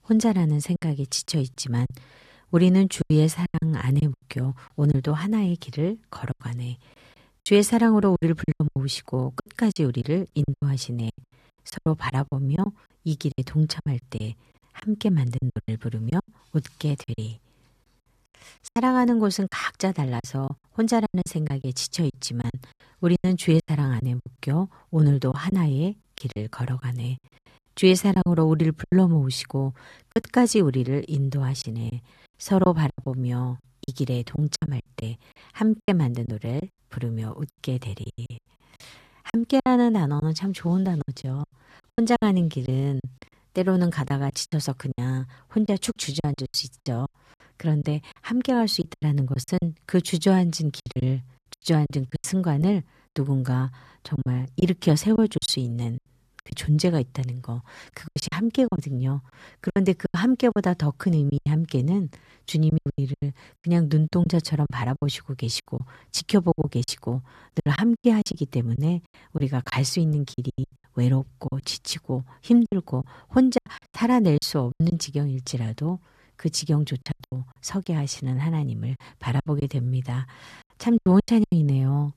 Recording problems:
choppy; very; 12% of the speech affected

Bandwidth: 14 kHz